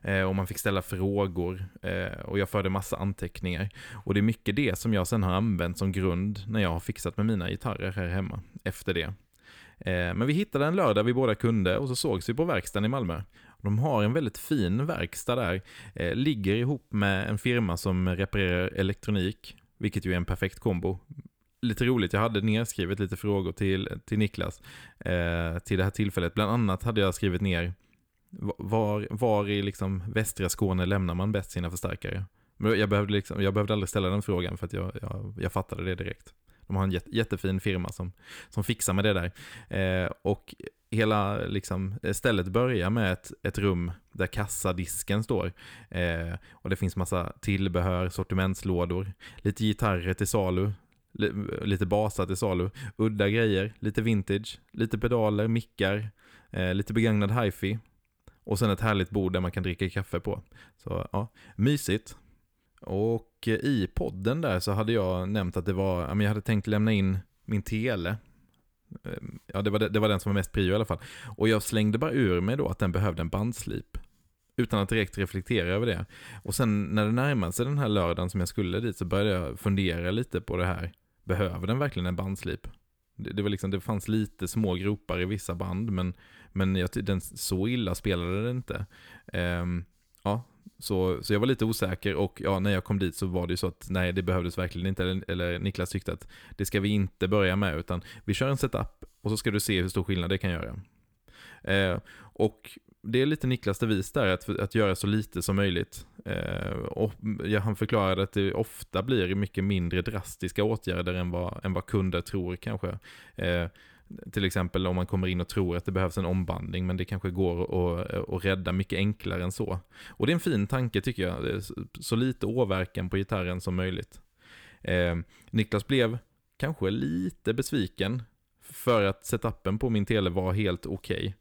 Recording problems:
none

